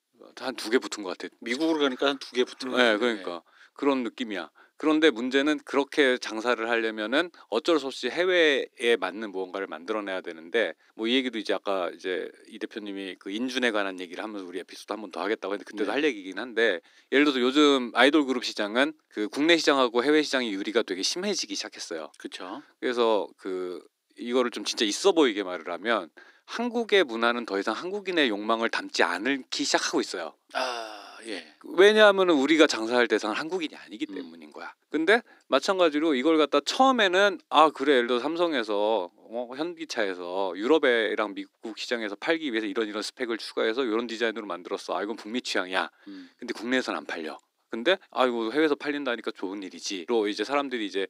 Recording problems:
thin; somewhat; fading below 300 Hz

